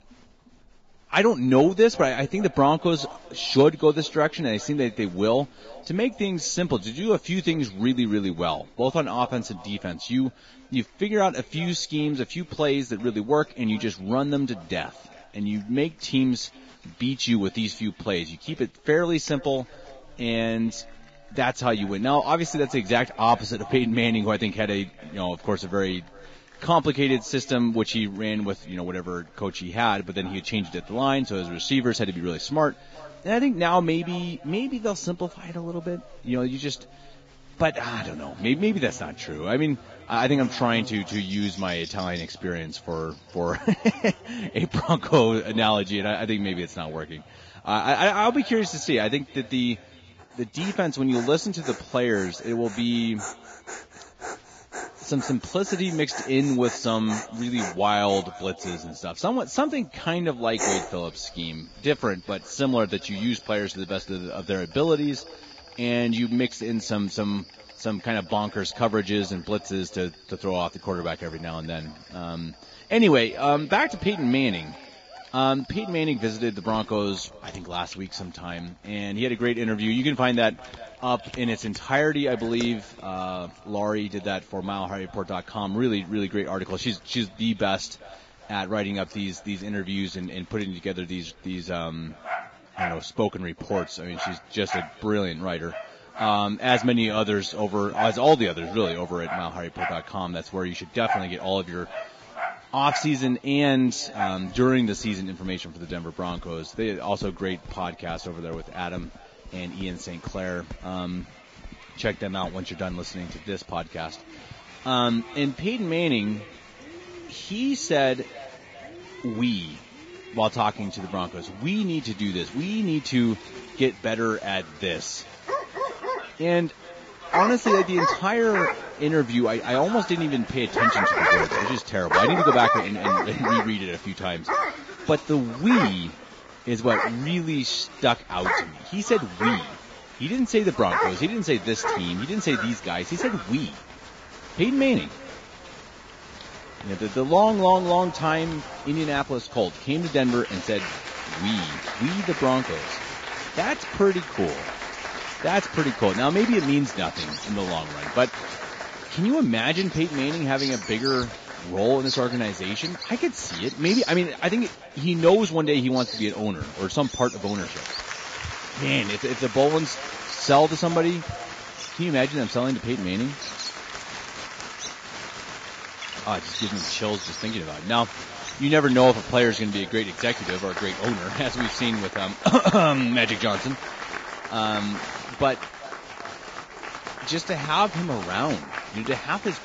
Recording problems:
garbled, watery; badly
echo of what is said; faint; throughout; 390 ms later, 25 dB below the speech
animal sounds; loud; throughout; 5 dB below the speech
crowd noise; noticeable; throughout; 10 dB below the speech

